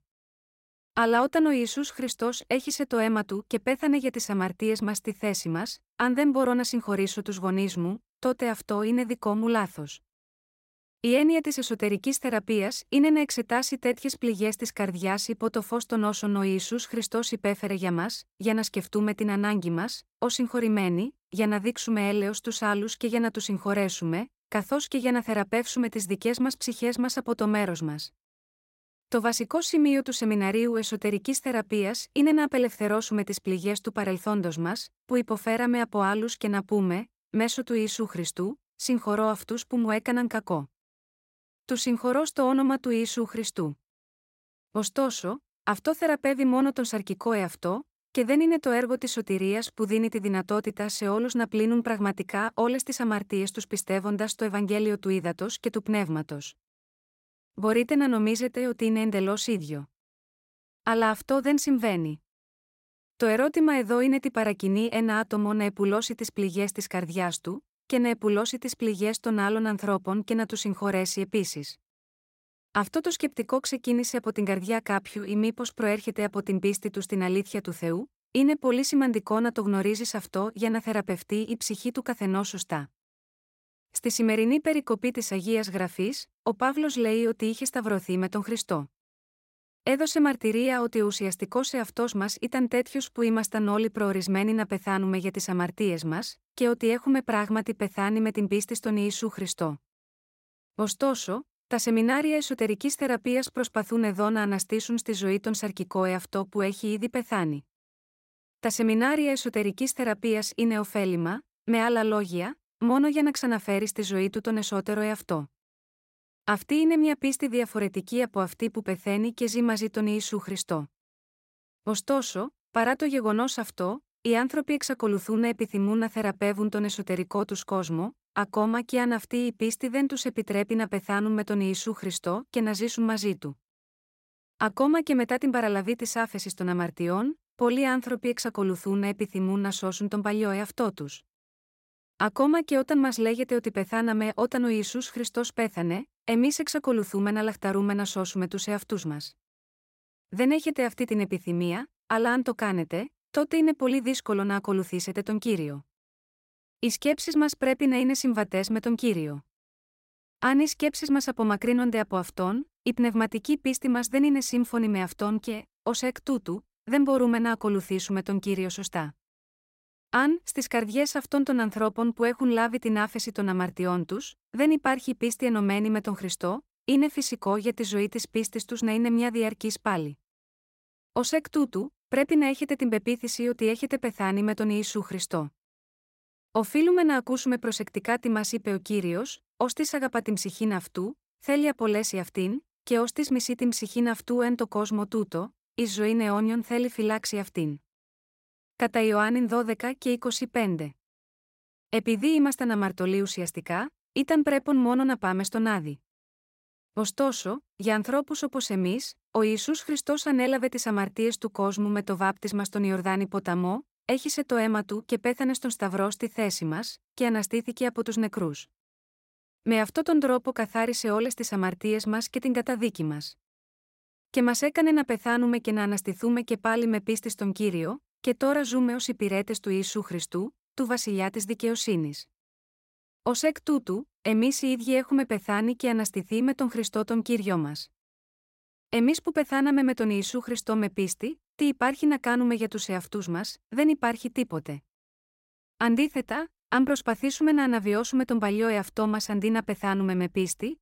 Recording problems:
none

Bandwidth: 16 kHz